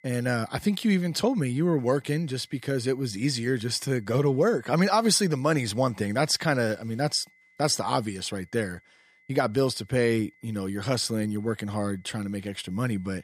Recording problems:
high-pitched whine; faint; throughout; 2 kHz, 35 dB below the speech

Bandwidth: 14.5 kHz